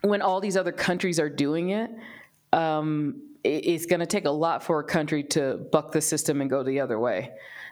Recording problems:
squashed, flat; somewhat

